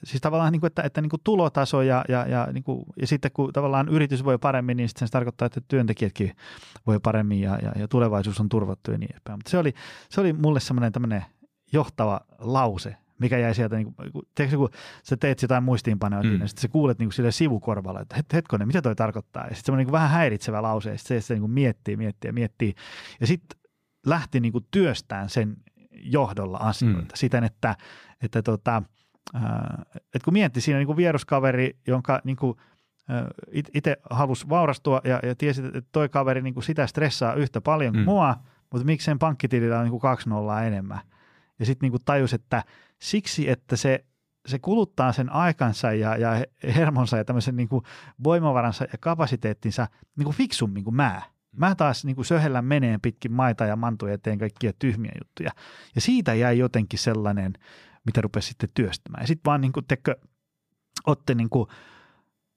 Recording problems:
none

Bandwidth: 15 kHz